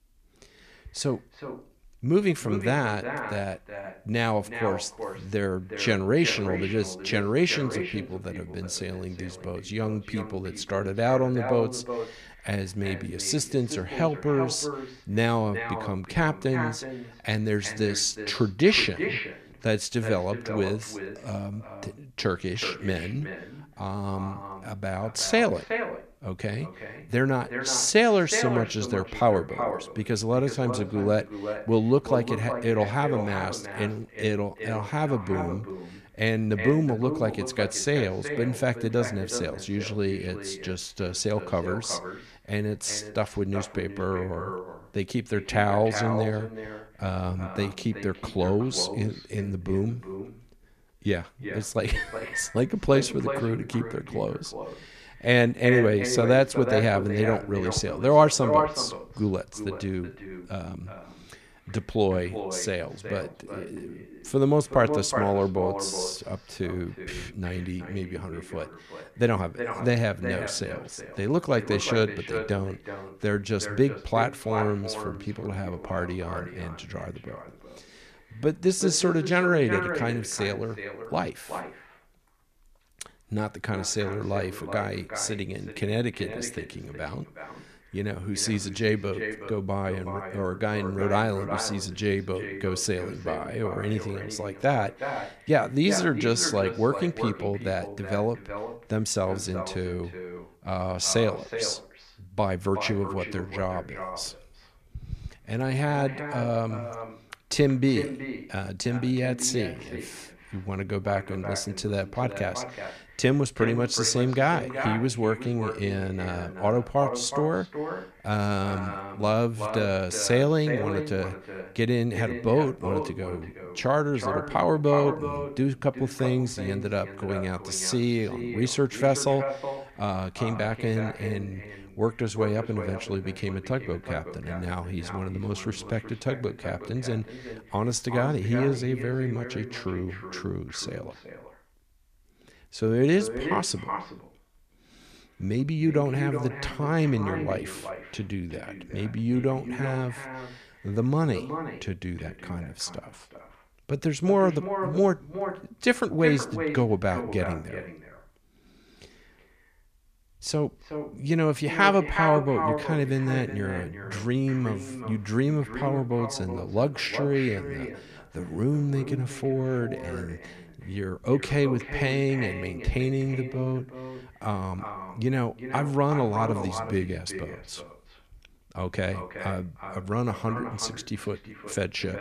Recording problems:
echo of what is said; strong; throughout; 370 ms later, 8 dB below the speech

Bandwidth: 14.5 kHz